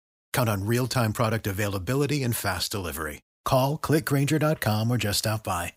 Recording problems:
none

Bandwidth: 15.5 kHz